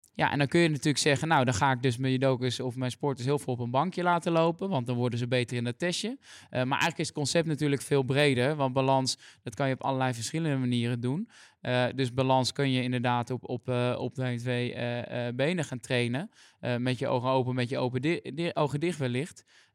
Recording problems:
none

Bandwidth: 16 kHz